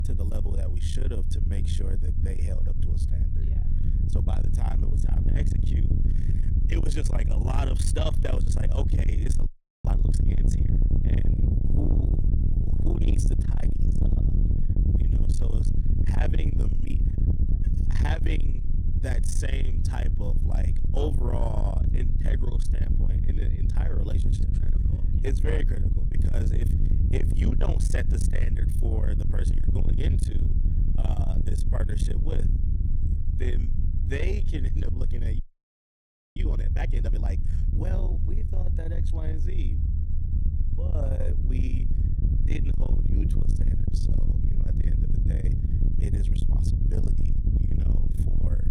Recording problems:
distortion; heavy; 7 dB below the speech
low rumble; loud; throughout; 3 dB below the speech
audio freezing; at 9.5 s and at 35 s for 1 s

